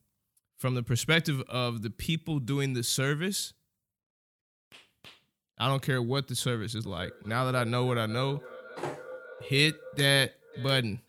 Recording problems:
echo of what is said; noticeable; from 7 s on; 550 ms later, 15 dB below the speech

